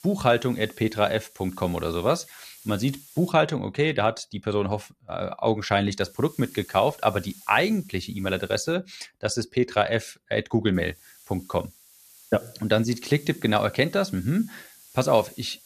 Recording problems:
hiss; faint; until 3.5 s, from 6 to 8.5 s and from 11 s on; 20 dB below the speech

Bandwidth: 14.5 kHz